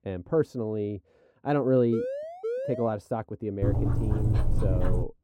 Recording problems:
muffled; very; fading above 1 kHz
siren; noticeable; from 2 to 3 s; peak 3 dB below the speech
dog barking; loud; from 3.5 s on; peak 3 dB above the speech

